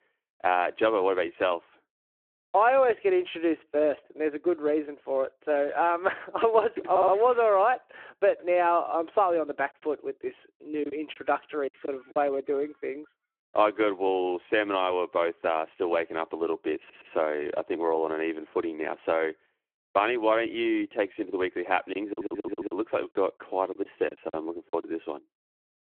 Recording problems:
phone-call audio
audio stuttering; at 7 s, at 17 s and at 22 s
choppy; very; from 11 to 12 s and from 22 to 25 s; 9% of the speech affected

